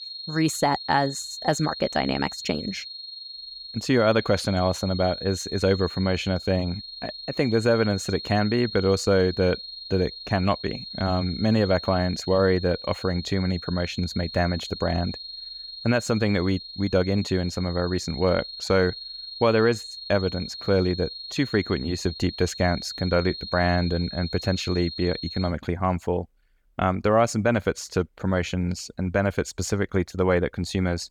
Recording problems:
high-pitched whine; noticeable; until 25 s; 4 kHz, 10 dB below the speech

